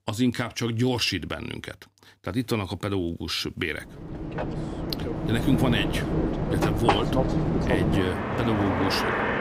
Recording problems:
train or aircraft noise; very loud; from 4 s on; 1 dB above the speech

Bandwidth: 15.5 kHz